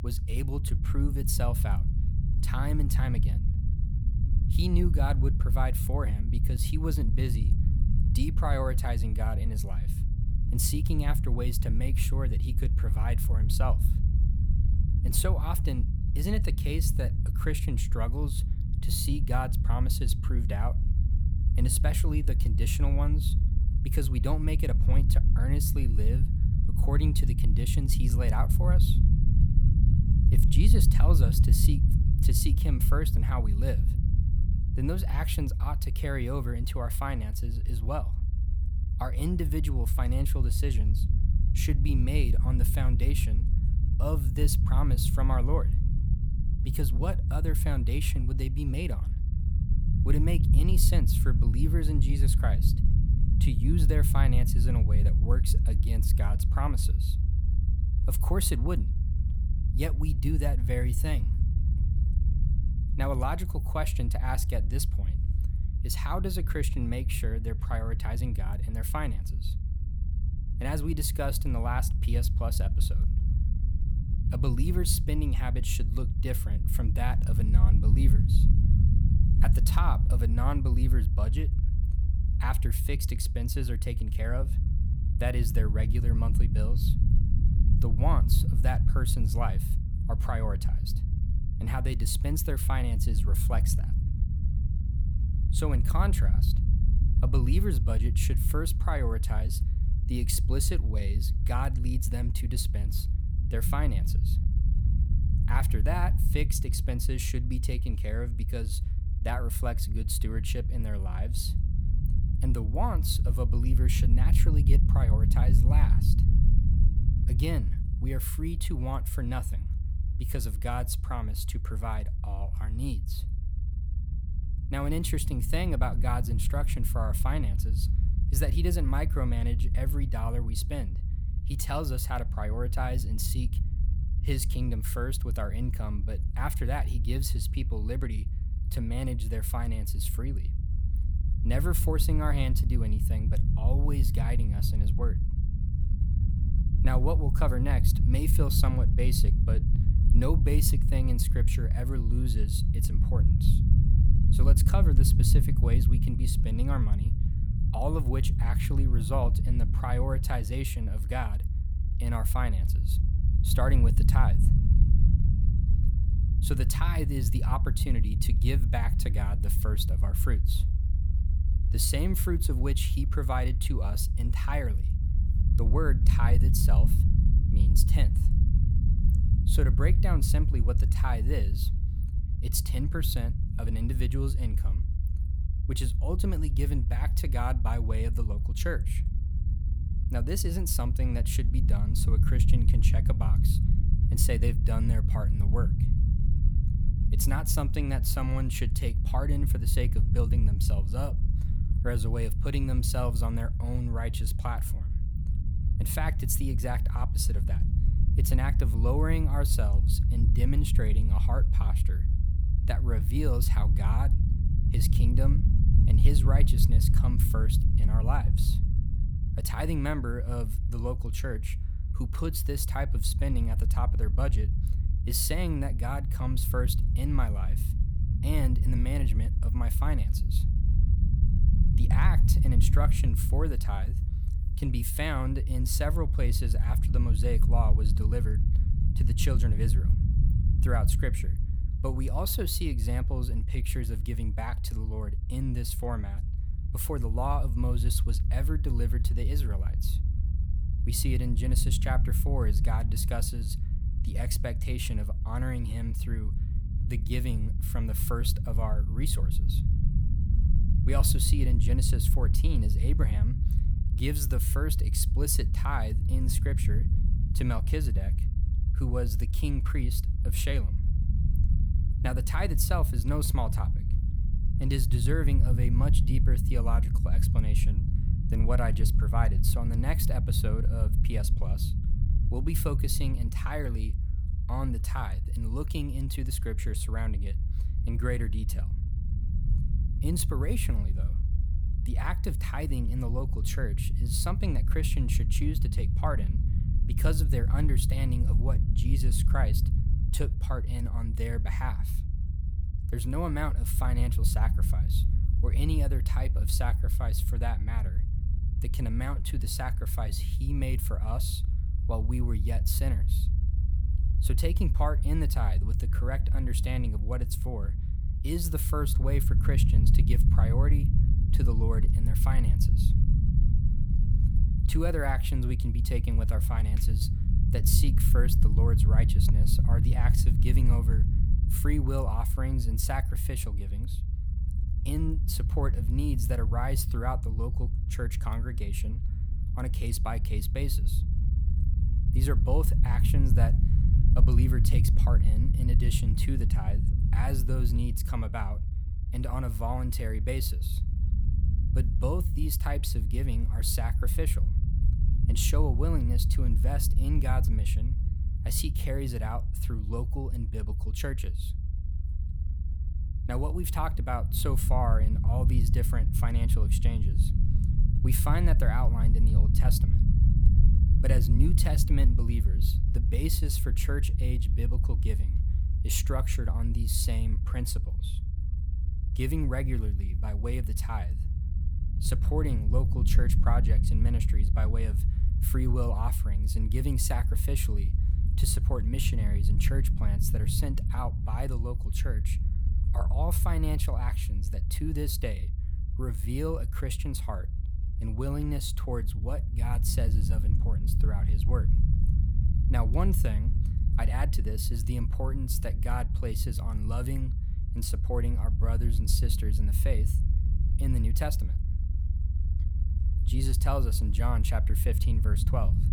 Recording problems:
low rumble; loud; throughout; 7 dB below the speech

